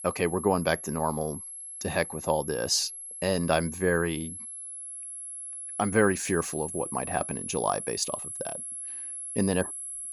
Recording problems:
high-pitched whine; loud; throughout; 11 kHz, 7 dB below the speech

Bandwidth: 17.5 kHz